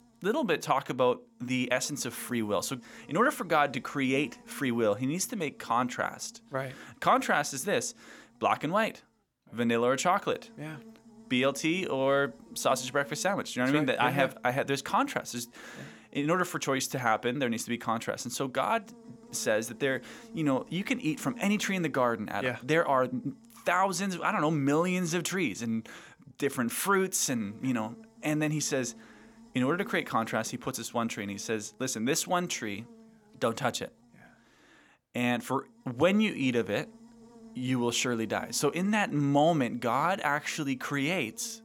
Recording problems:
electrical hum; faint; throughout; 60 Hz, 30 dB below the speech

